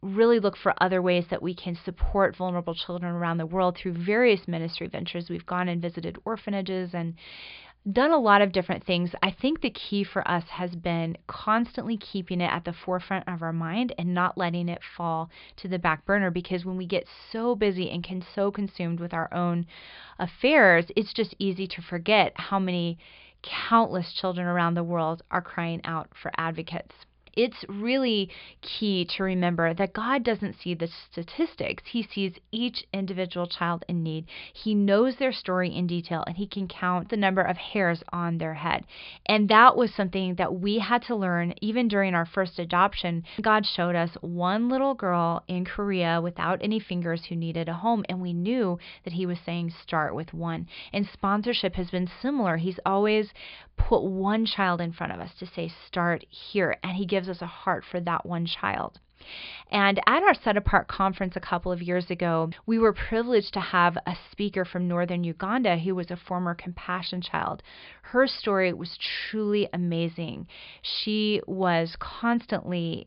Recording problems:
high frequencies cut off; severe; nothing above 5 kHz

